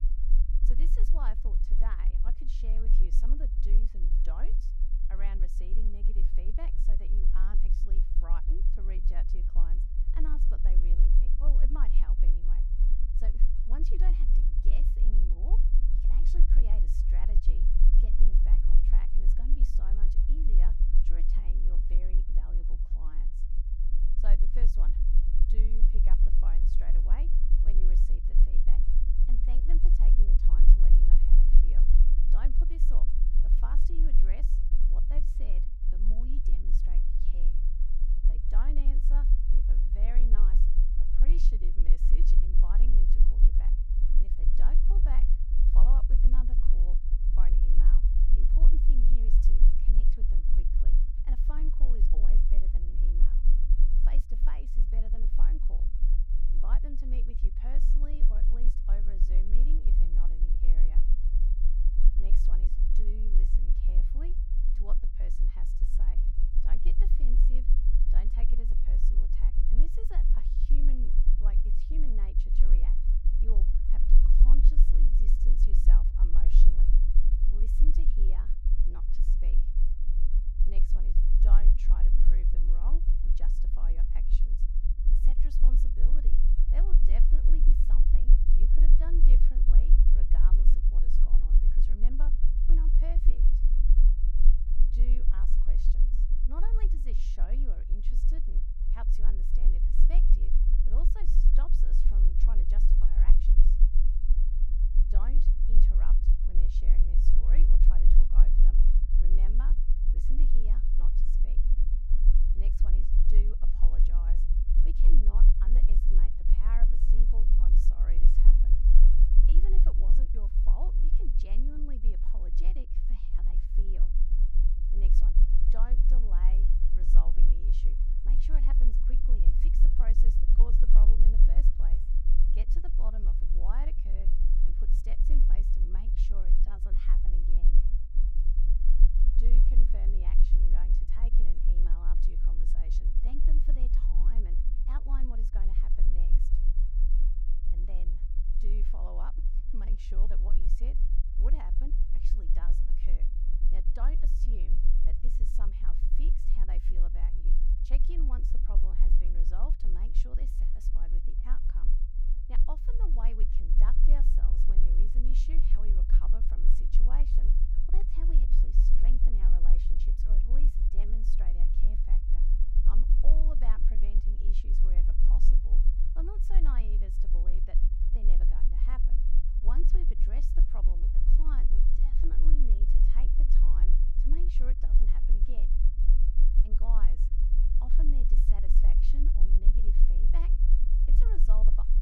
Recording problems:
low rumble; loud; throughout; 3 dB below the speech

